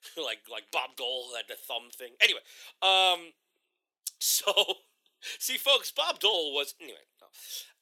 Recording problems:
thin; very; fading below 400 Hz

